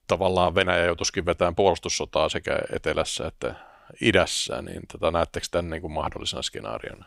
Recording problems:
none

